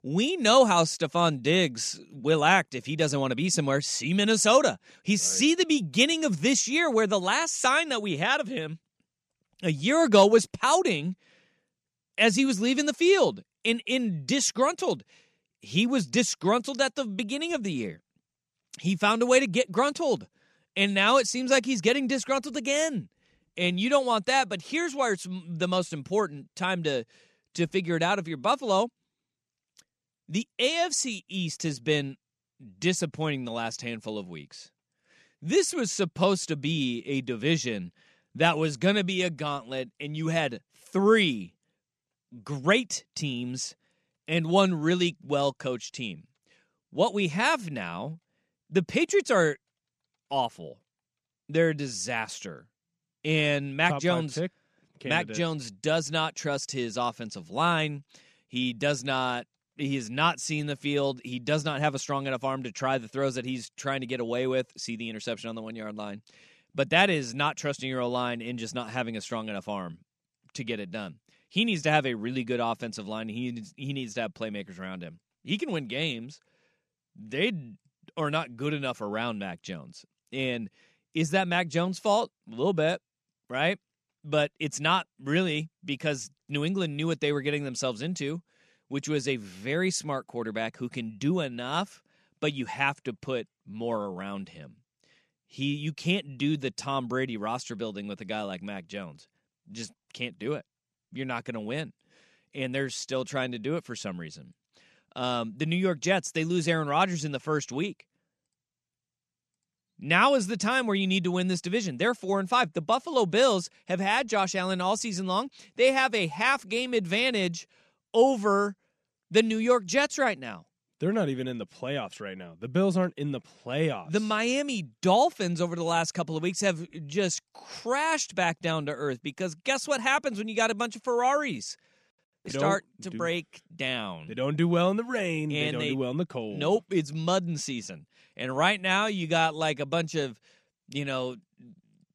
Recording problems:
none

